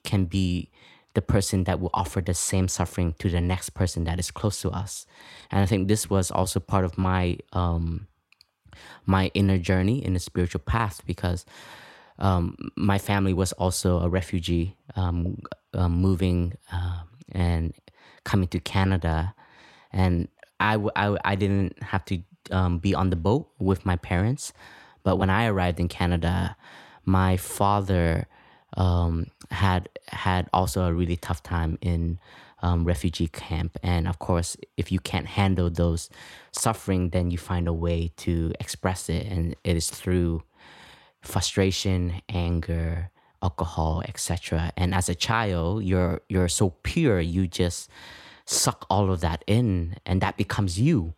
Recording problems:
none

